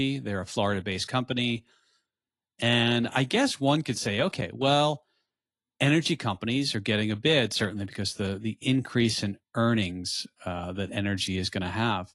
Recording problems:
garbled, watery; slightly; nothing above 11 kHz
abrupt cut into speech; at the start

